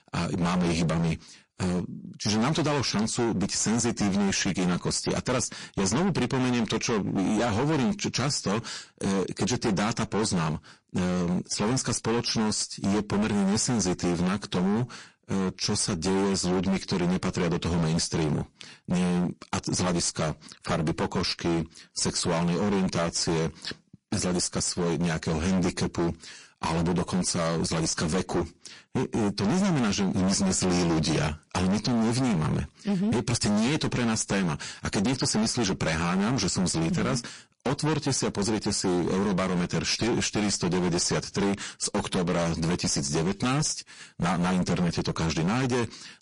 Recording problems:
distortion; heavy; 27% of the sound clipped
garbled, watery; slightly; nothing above 10.5 kHz

